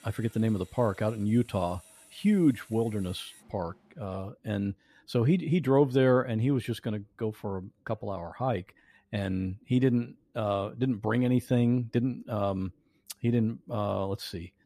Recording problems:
machinery noise; faint; until 4 s; 25 dB below the speech

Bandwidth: 14.5 kHz